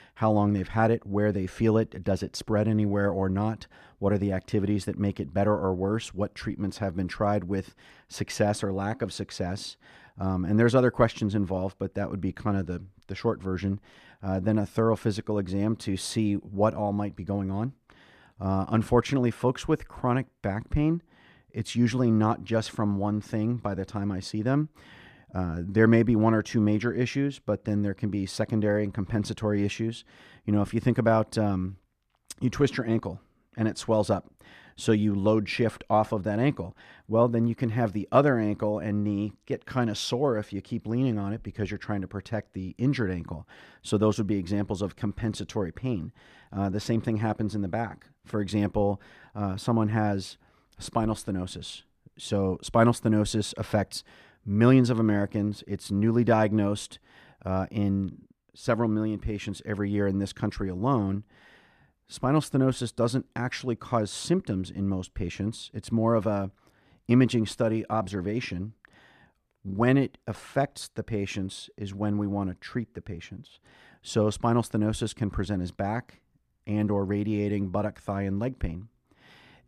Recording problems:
muffled; slightly; fading above 2.5 kHz

